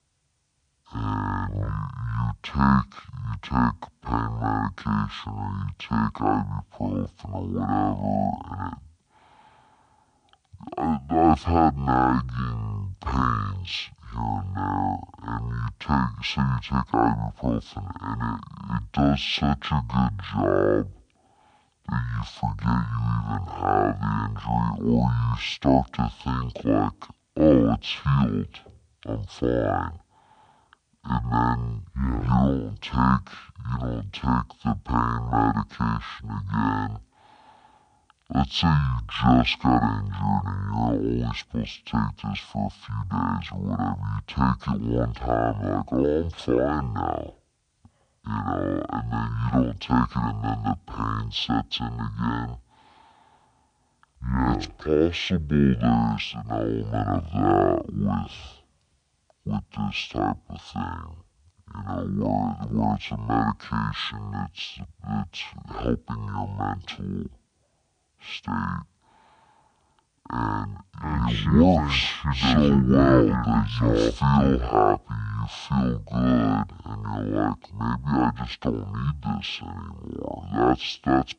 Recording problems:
wrong speed and pitch; too slow and too low; 0.5 times normal speed

